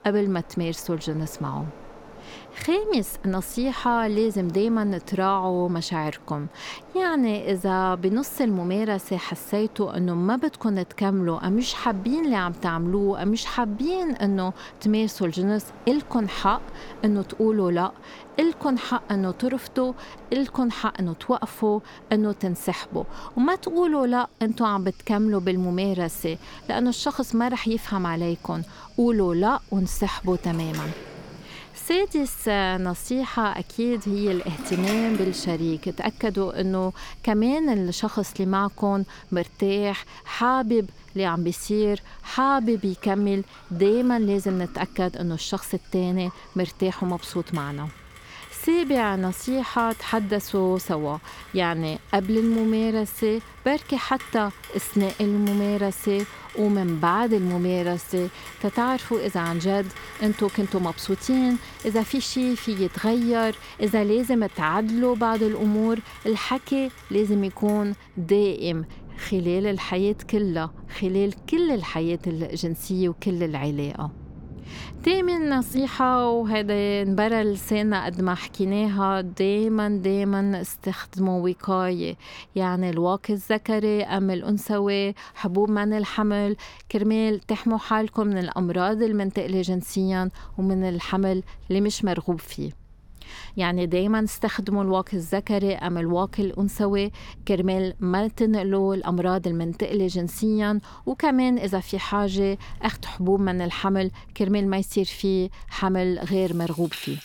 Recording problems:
rain or running water; noticeable; throughout; 20 dB below the speech

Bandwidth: 18 kHz